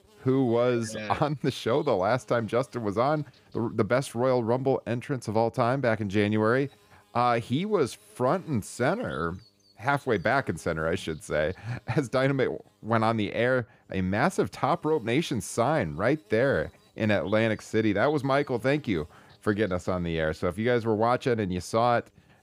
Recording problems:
electrical hum; faint; throughout; 50 Hz, 30 dB below the speech

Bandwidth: 15.5 kHz